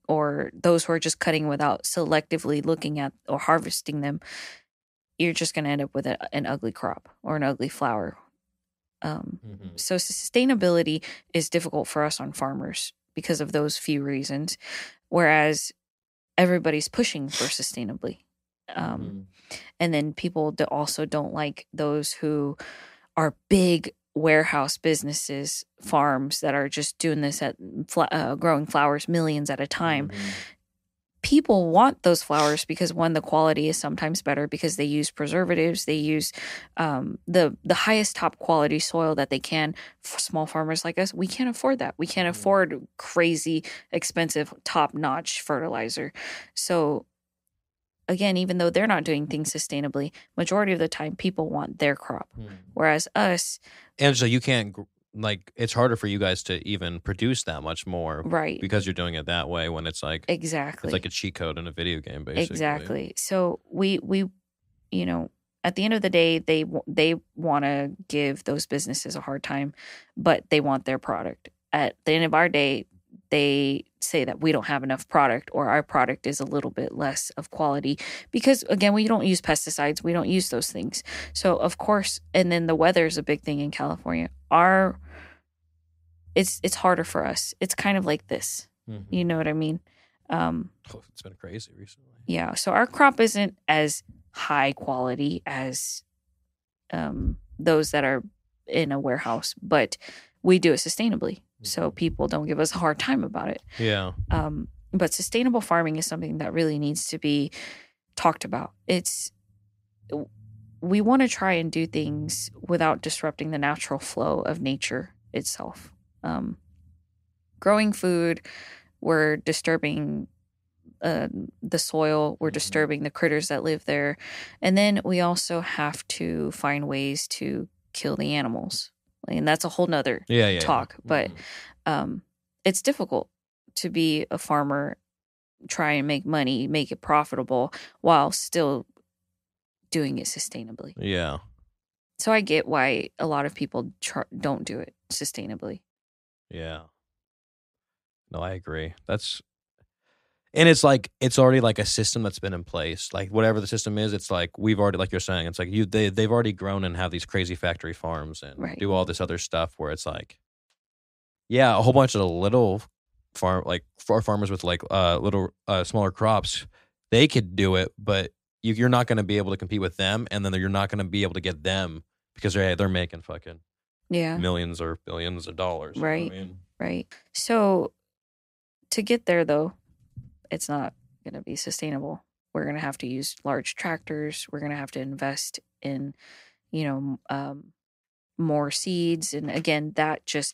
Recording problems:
none

